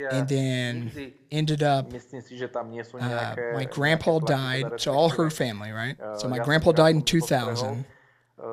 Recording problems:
voice in the background; noticeable; throughout; 10 dB below the speech

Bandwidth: 15 kHz